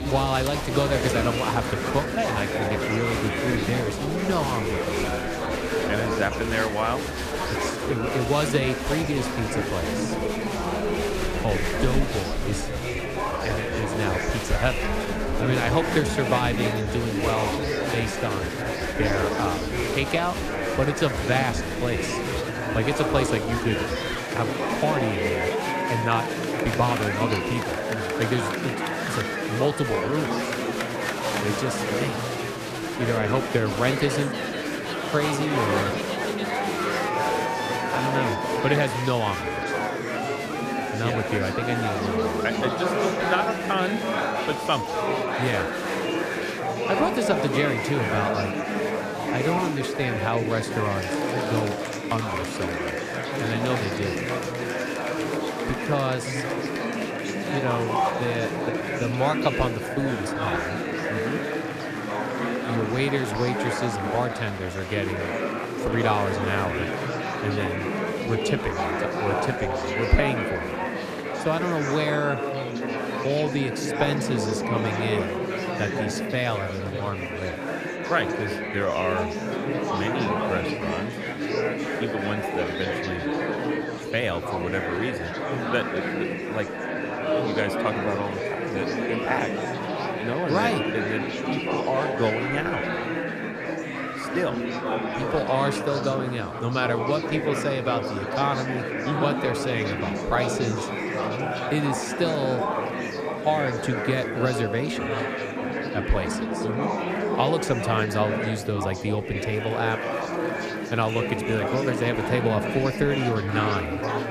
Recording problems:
murmuring crowd; very loud; throughout; as loud as the speech

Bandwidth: 14.5 kHz